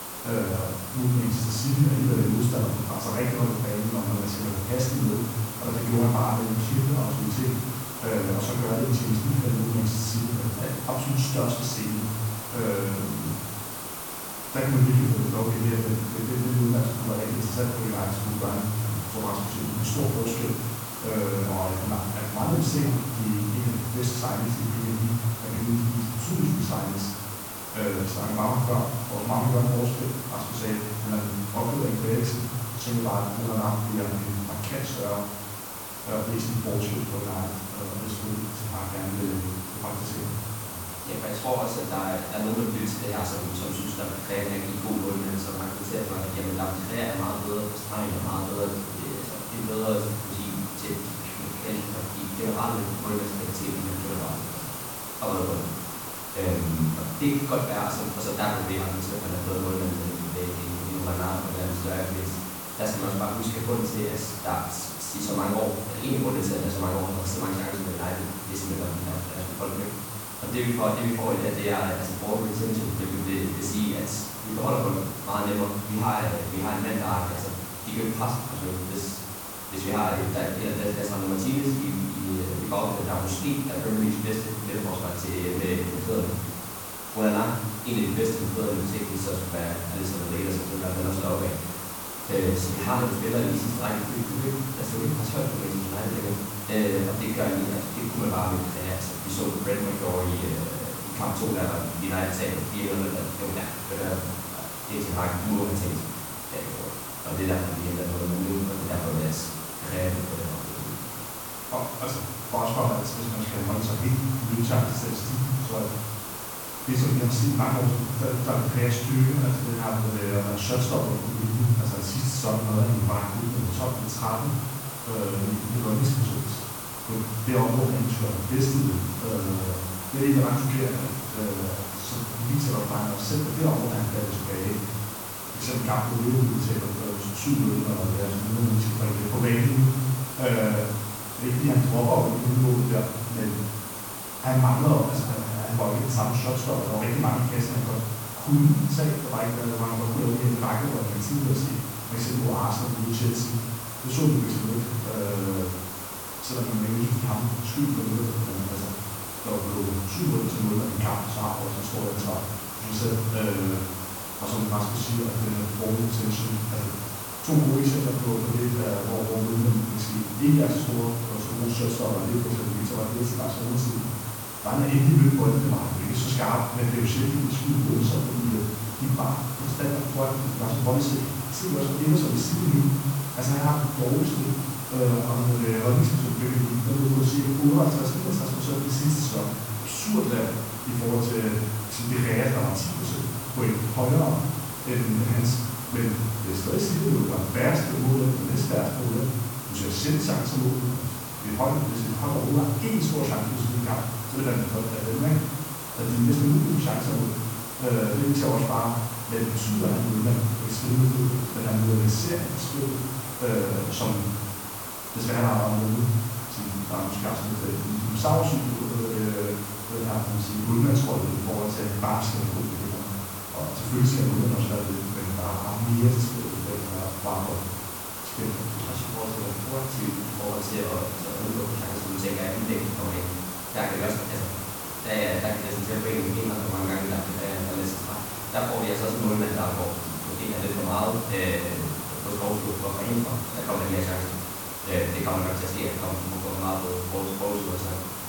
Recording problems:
off-mic speech; far
room echo; noticeable; dies away in 0.9 s
hiss; loud; throughout; 7 dB below the speech
high-pitched whine; faint; throughout; 9 kHz, 20 dB below the speech

